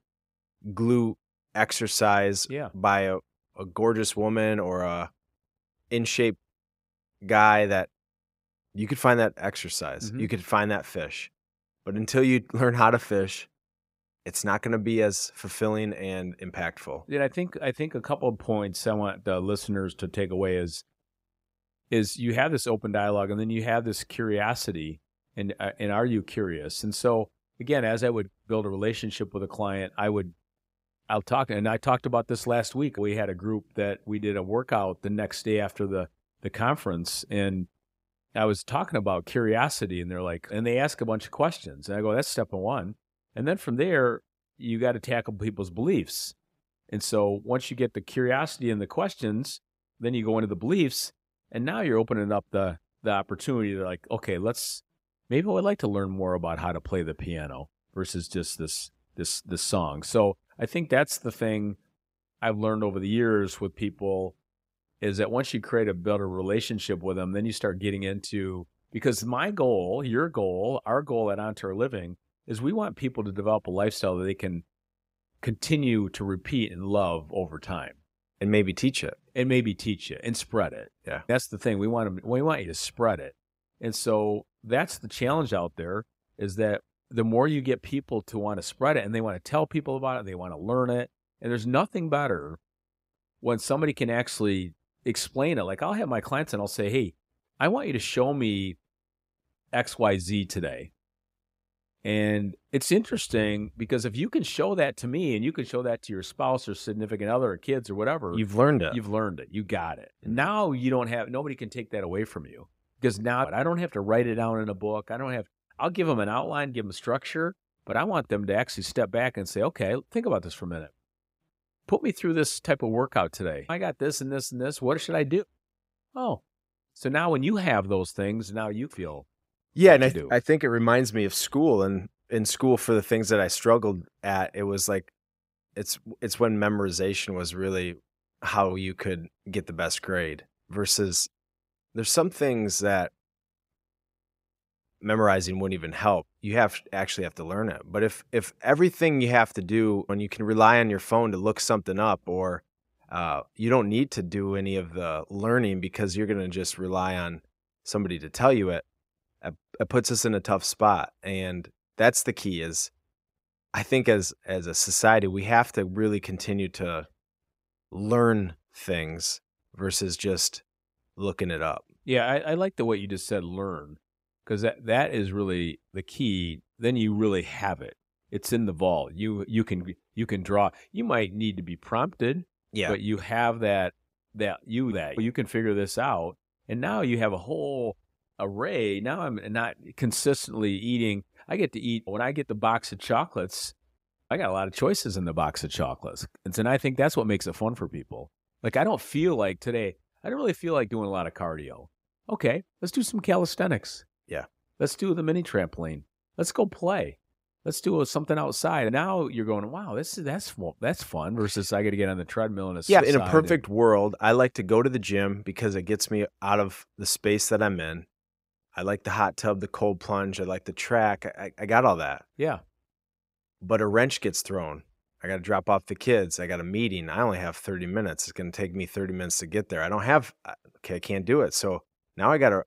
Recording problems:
none

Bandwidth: 15.5 kHz